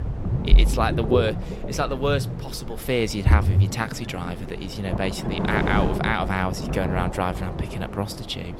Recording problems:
rain or running water; very loud; throughout; 1 dB above the speech
wind noise on the microphone; occasional gusts; 10 dB below the speech

